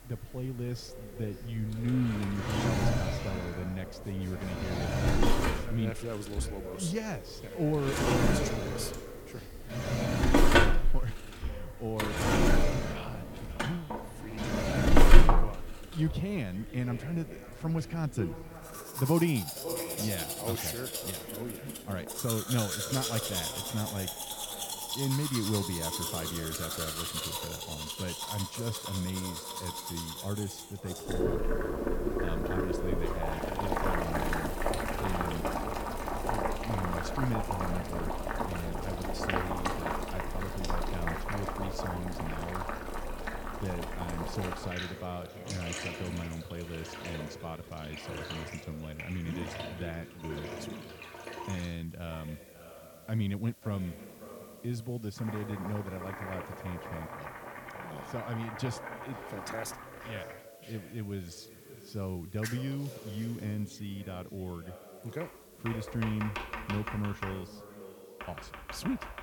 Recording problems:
echo of what is said; strong; throughout; 540 ms later, 10 dB below the speech
household noises; very loud; throughout; 3 dB above the speech
hiss; faint; throughout; 20 dB below the speech

